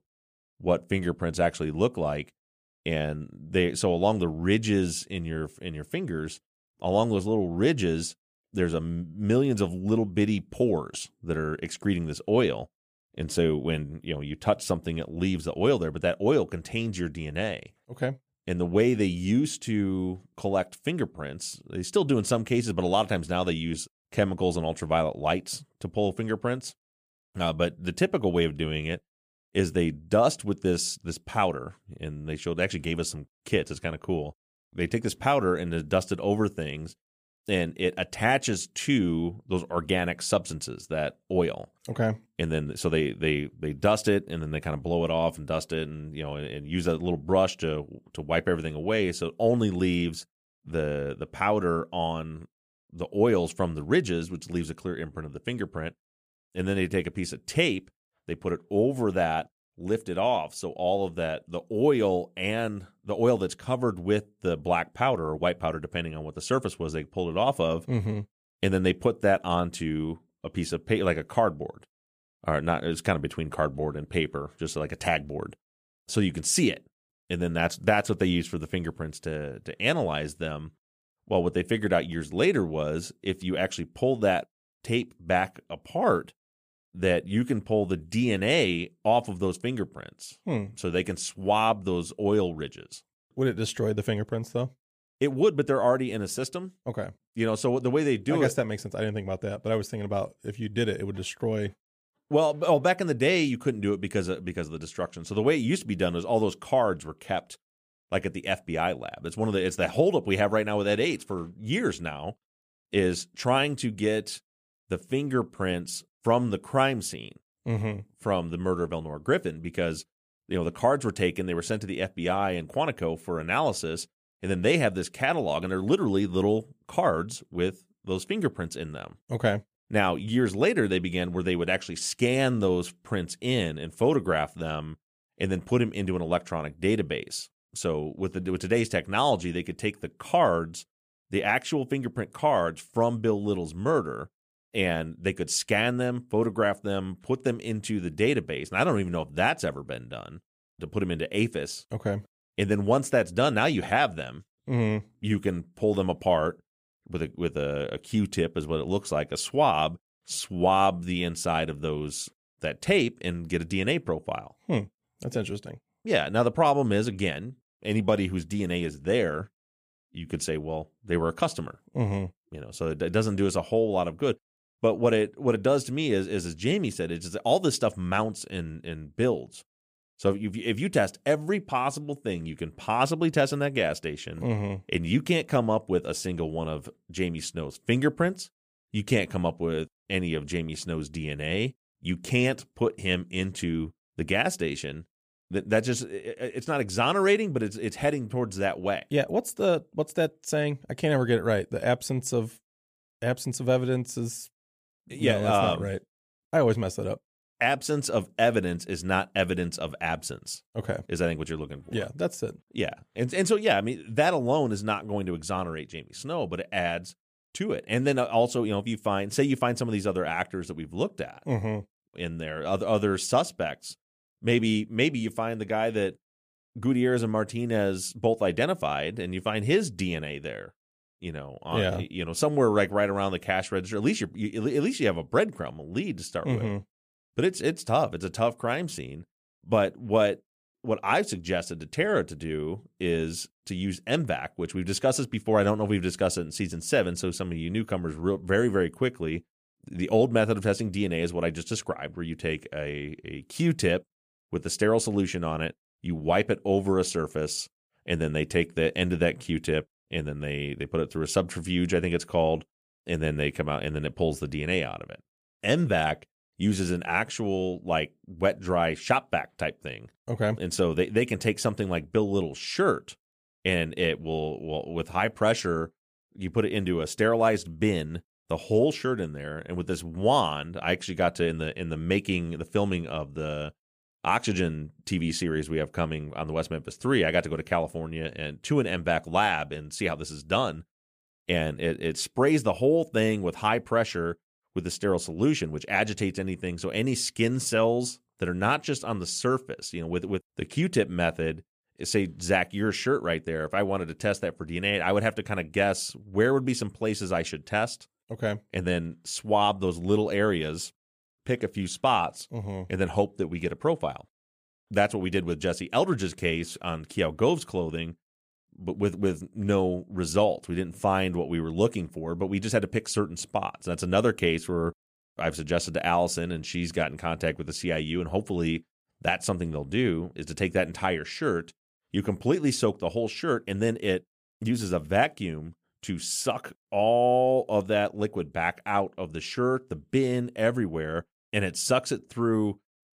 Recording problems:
none

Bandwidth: 15 kHz